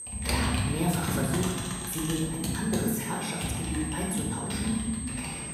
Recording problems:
room echo; noticeable; dies away in 1.3 s
off-mic speech; somewhat distant
high-pitched whine; loud; throughout; 8.5 kHz, 5 dB below the speech
household noises; loud; throughout; 2 dB below the speech

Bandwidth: 15 kHz